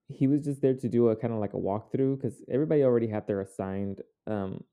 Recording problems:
muffled; very; fading above 1 kHz

